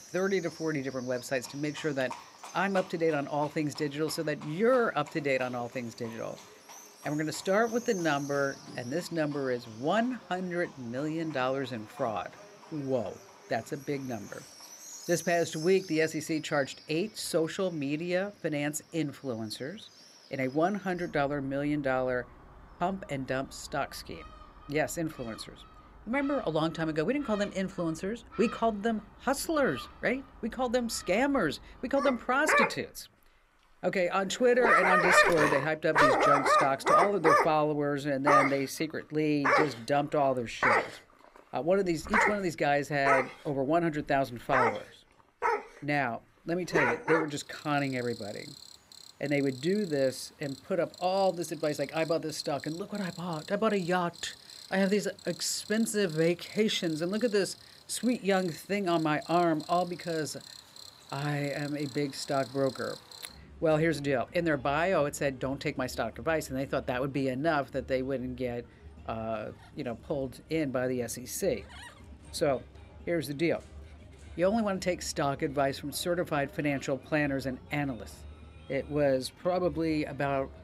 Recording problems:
animal sounds; very loud; throughout; 1 dB above the speech

